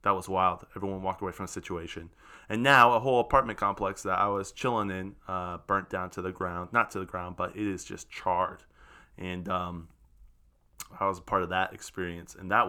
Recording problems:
abrupt cut into speech; at the end

